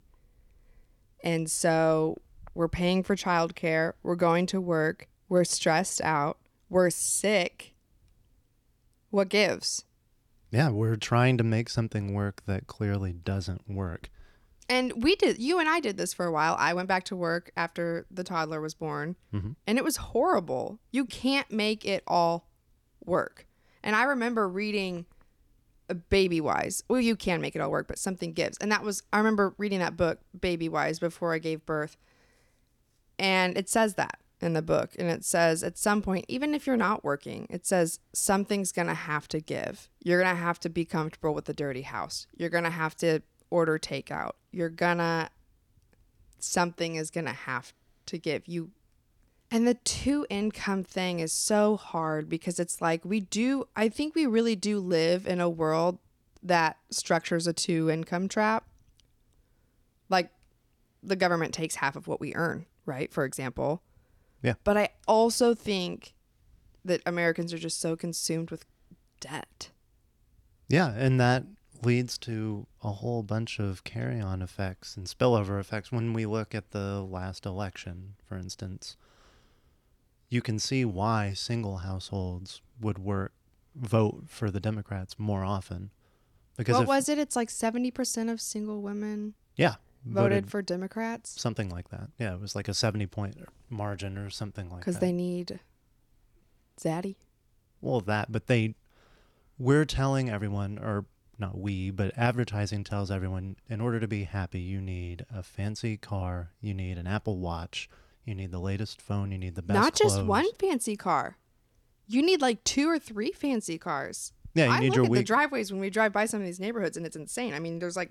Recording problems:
none

